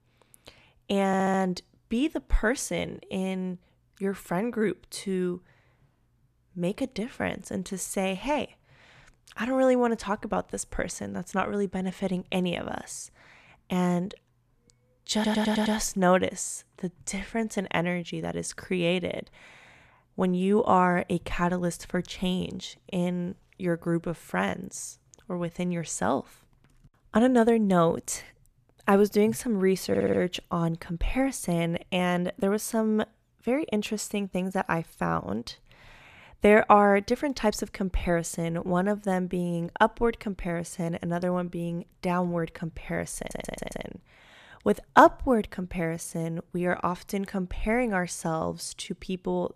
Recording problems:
audio stuttering; 4 times, first at 1 s

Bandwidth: 14.5 kHz